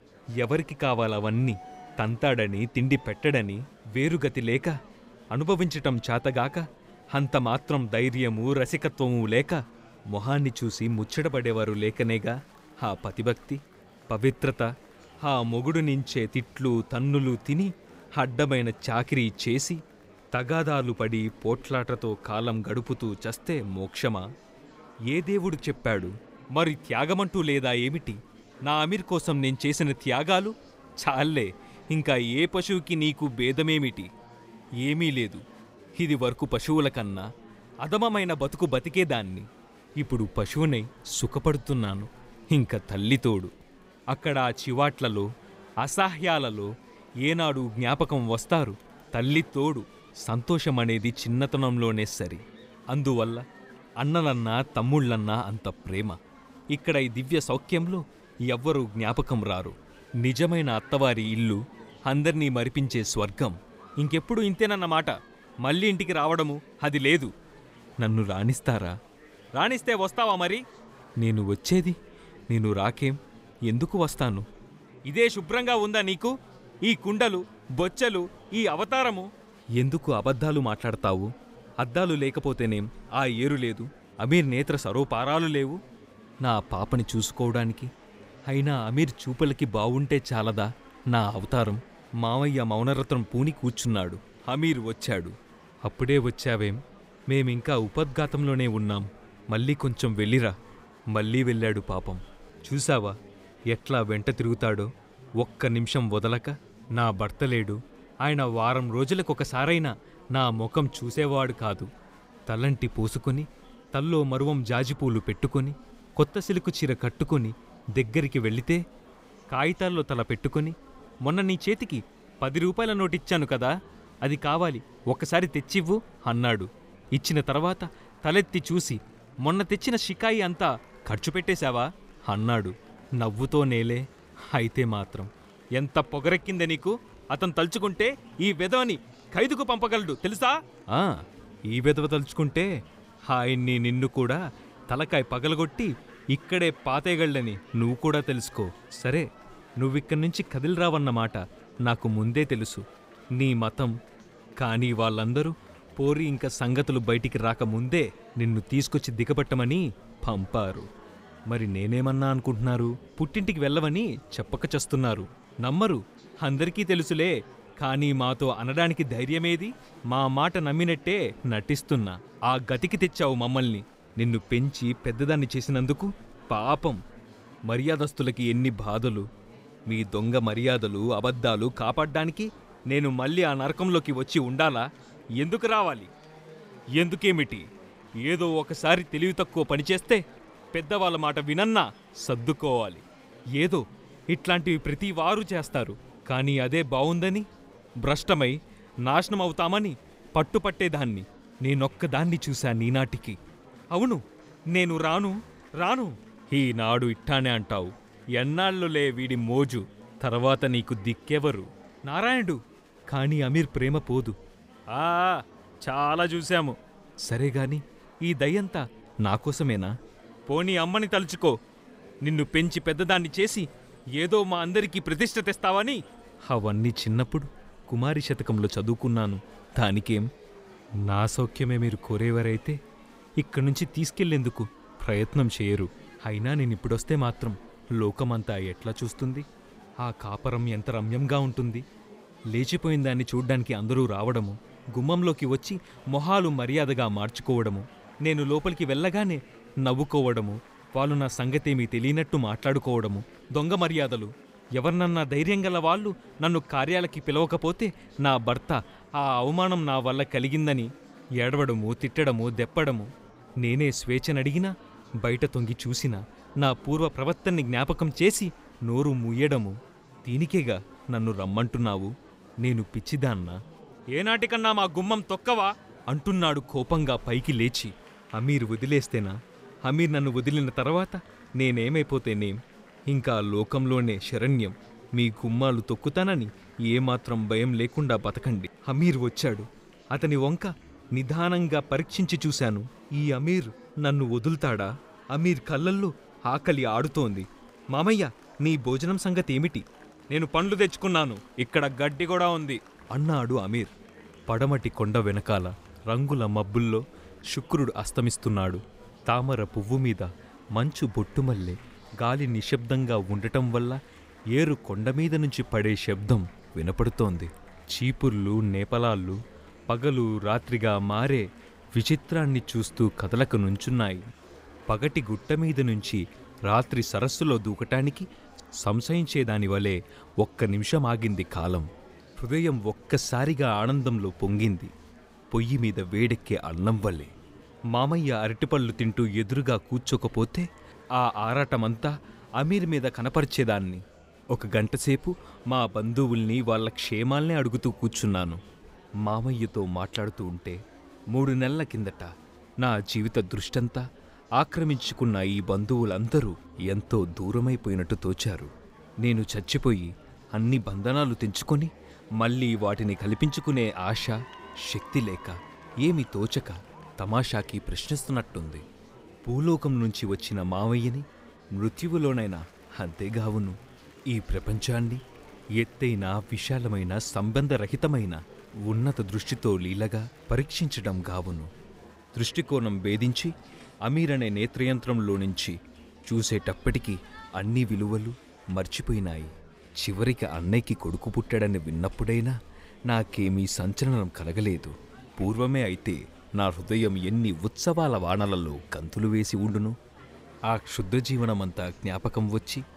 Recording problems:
murmuring crowd; faint; throughout; 25 dB below the speech

